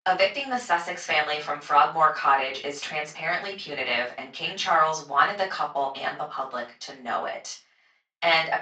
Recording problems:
off-mic speech; far
thin; somewhat; fading below 550 Hz
room echo; slight; dies away in 0.3 s
garbled, watery; slightly; nothing above 7.5 kHz

